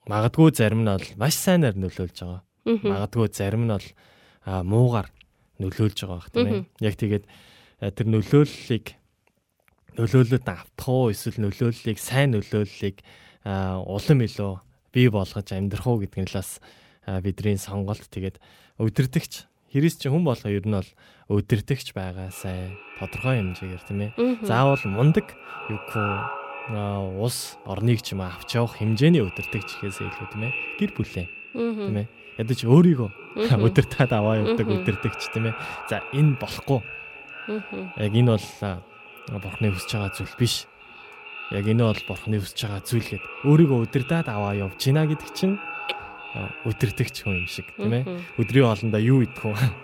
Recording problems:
echo of what is said; strong; from 22 s on; 450 ms later, 10 dB below the speech

